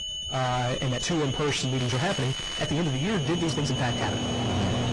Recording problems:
distortion; heavy; 5 dB below the speech
garbled, watery; slightly; nothing above 10 kHz
high-pitched whine; loud; throughout; 3 kHz, 5 dB below the speech
household noises; loud; throughout; 5 dB below the speech
crackling; noticeable; at 2 s; 10 dB below the speech
uneven, jittery; strongly; from 1 to 4 s

